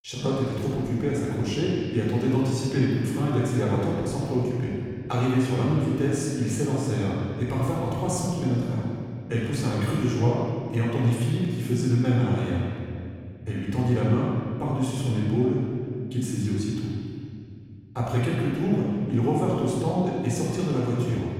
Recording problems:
room echo; strong; dies away in 2.4 s
off-mic speech; far

